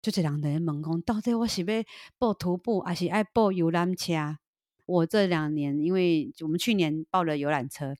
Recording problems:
none

